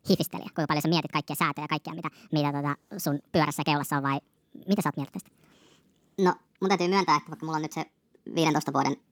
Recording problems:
wrong speed and pitch; too fast and too high; 1.5 times normal speed

